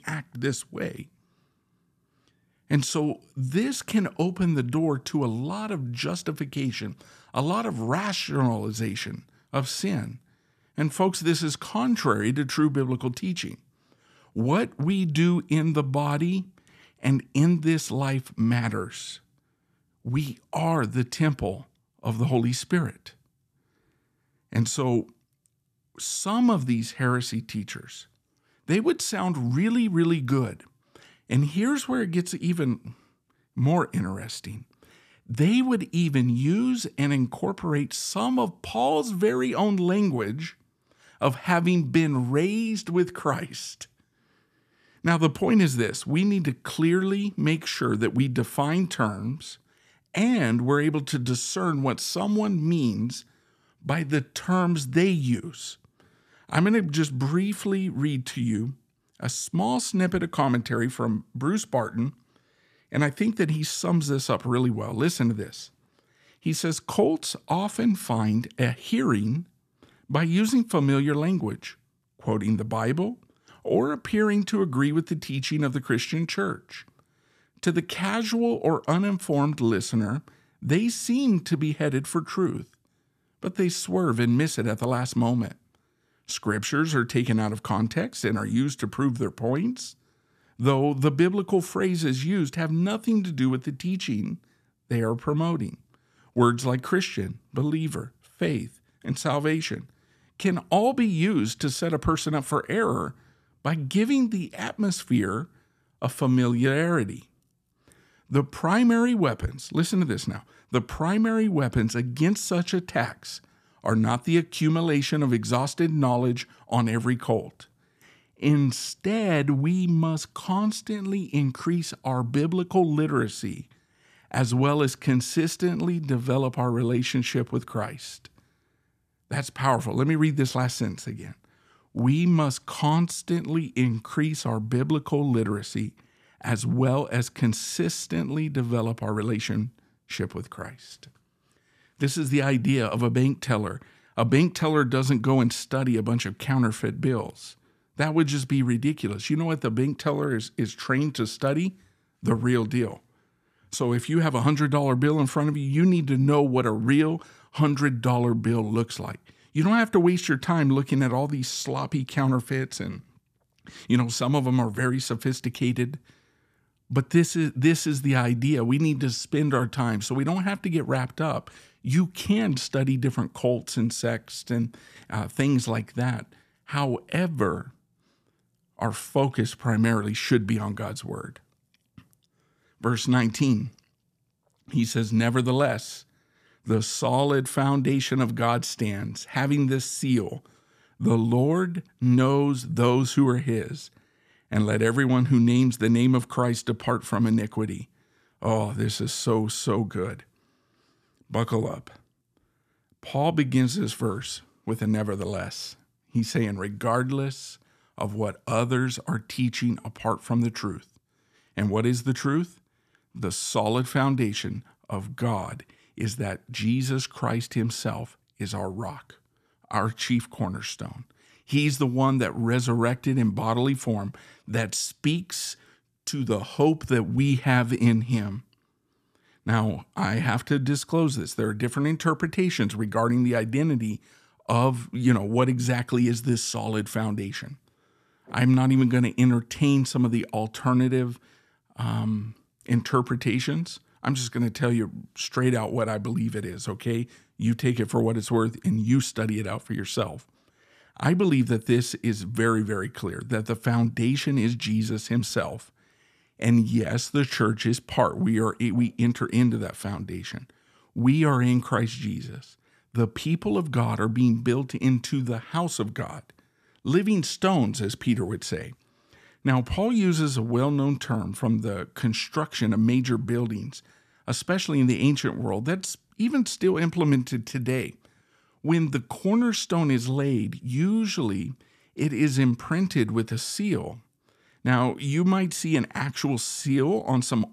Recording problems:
none

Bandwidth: 14.5 kHz